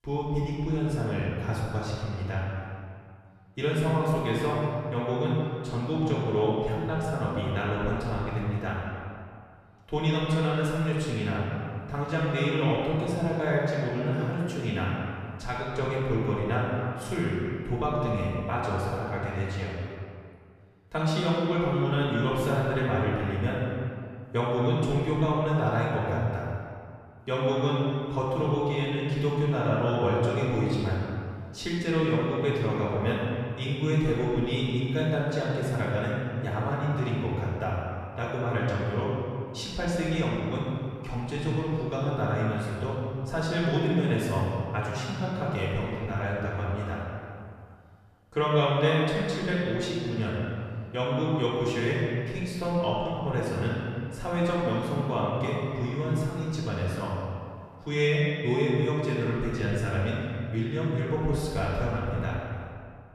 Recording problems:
room echo; strong; dies away in 2 s
off-mic speech; far

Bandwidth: 14 kHz